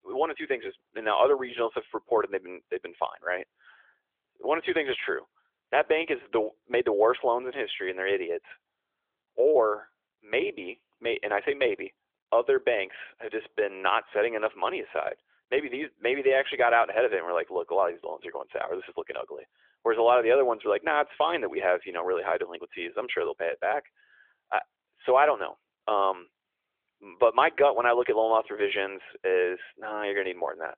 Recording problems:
phone-call audio; nothing above 3.5 kHz

